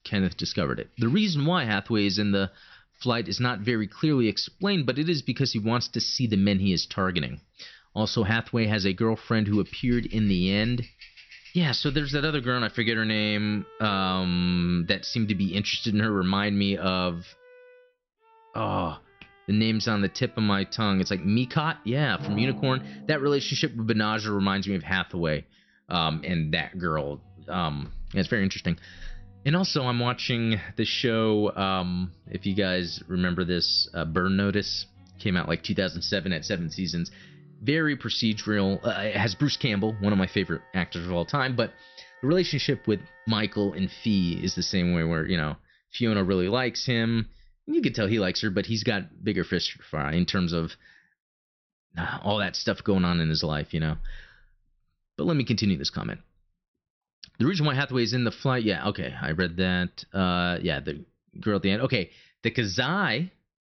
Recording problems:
high frequencies cut off; noticeable; nothing above 6 kHz
background music; faint; until 45 s; 25 dB below the speech

